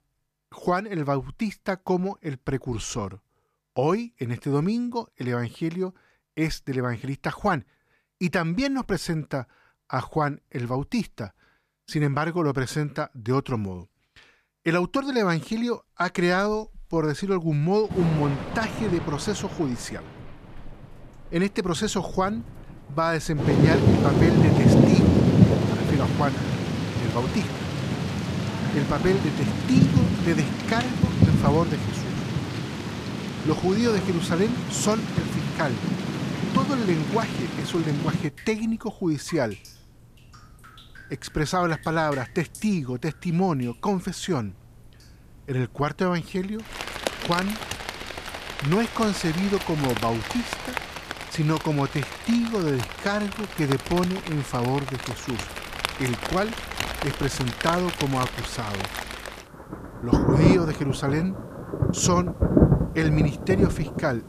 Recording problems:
rain or running water; very loud; from 16 s on; 1 dB above the speech

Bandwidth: 14.5 kHz